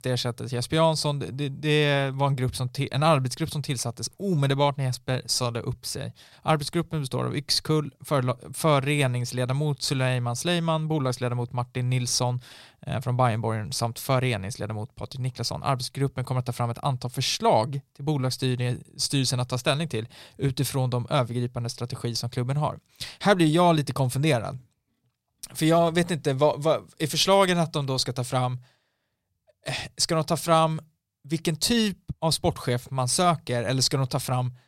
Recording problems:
none

